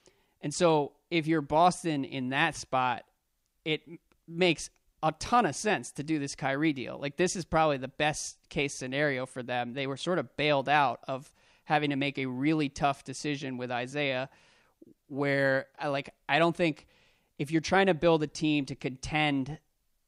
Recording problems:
none

